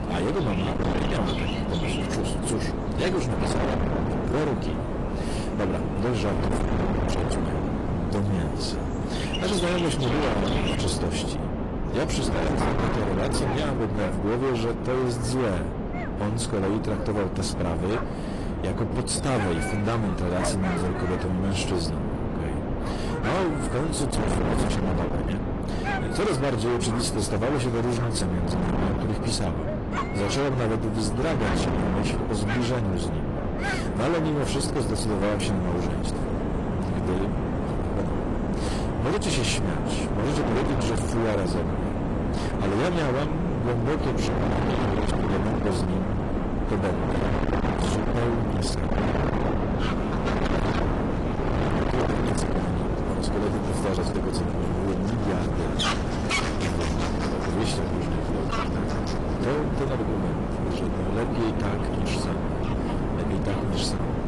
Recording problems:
distortion; heavy; 34% of the sound clipped
garbled, watery; slightly; nothing above 10.5 kHz
wind noise on the microphone; heavy; 1 dB below the speech
animal sounds; loud; throughout; 9 dB below the speech

